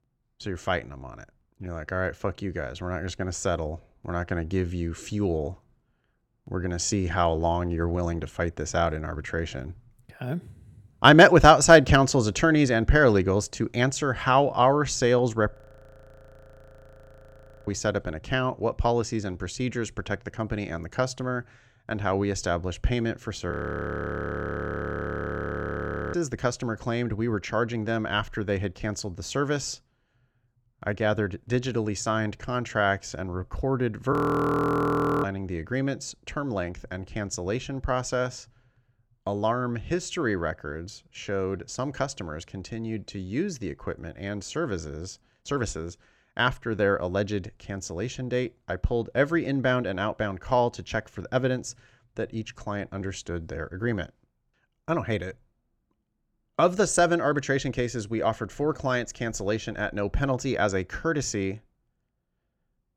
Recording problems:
audio freezing; at 16 s for 2 s, at 24 s for 2.5 s and at 34 s for 1 s

